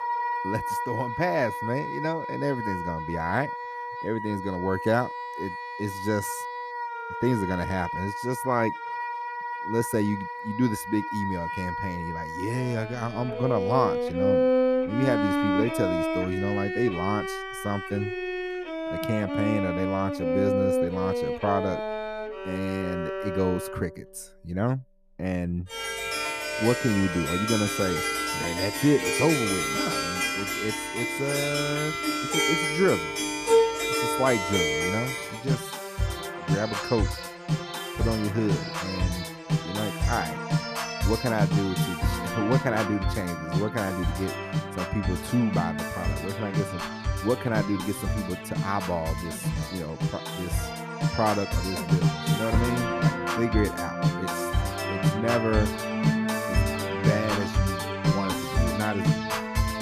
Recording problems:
background music; very loud; throughout; 1 dB above the speech

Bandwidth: 14.5 kHz